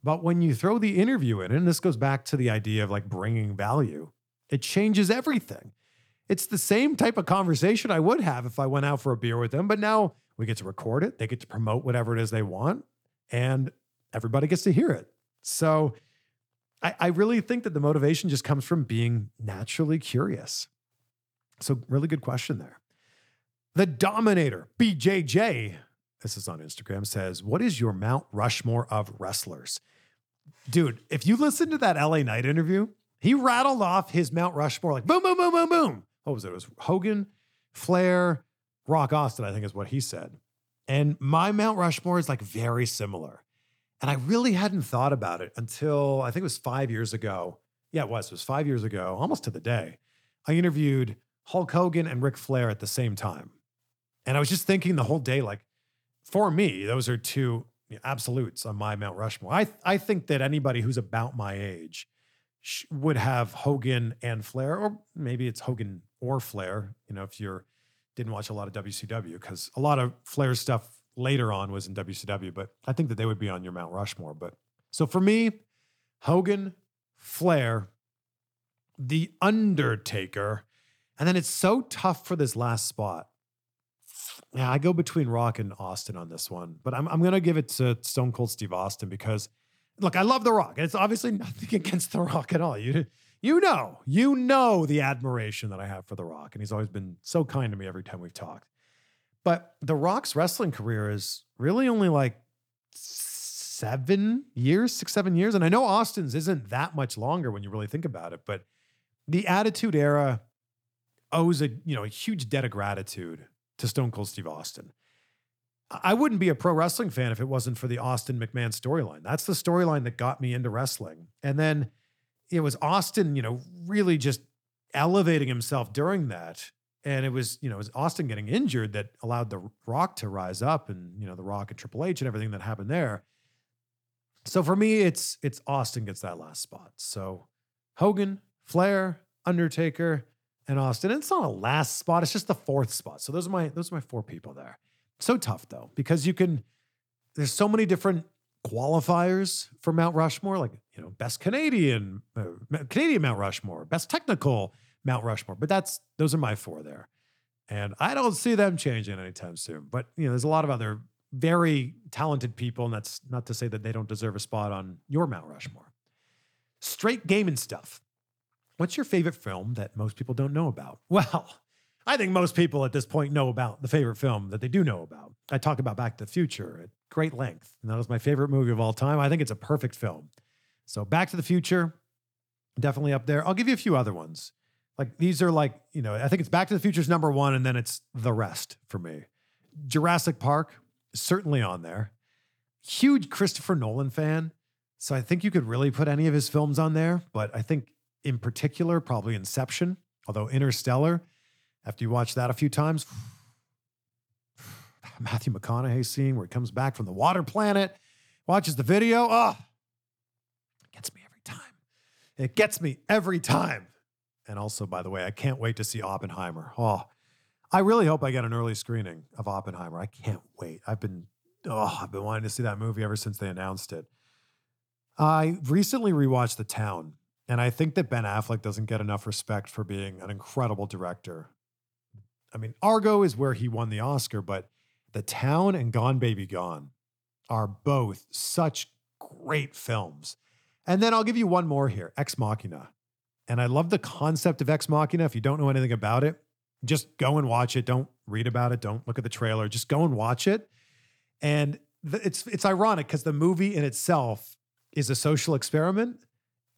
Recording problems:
none

